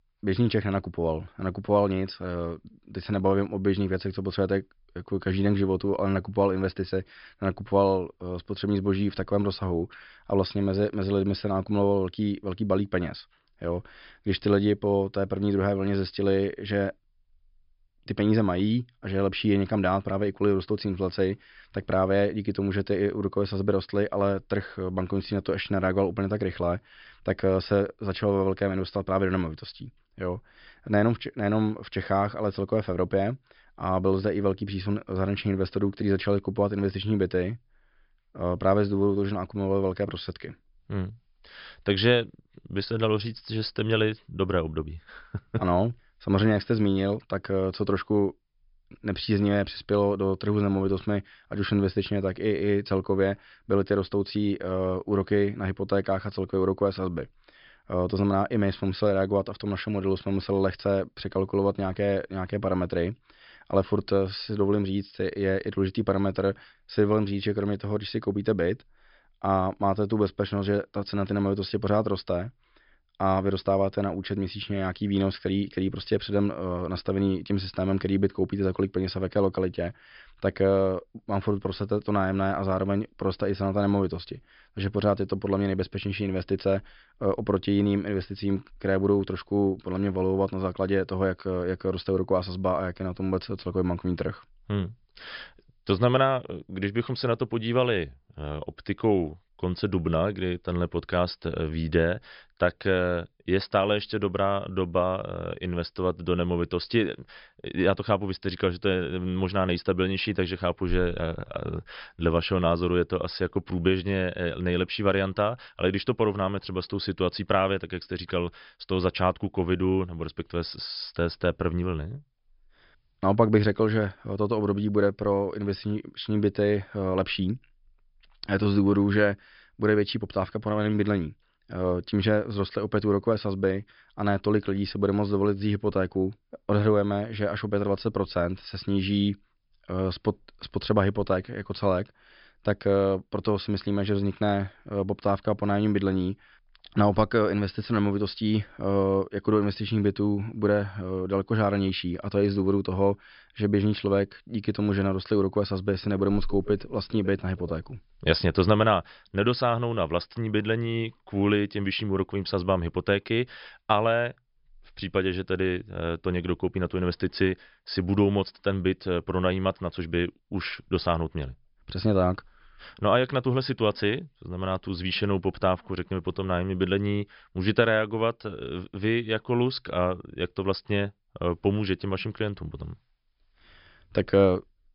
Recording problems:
high frequencies cut off; noticeable; nothing above 5.5 kHz

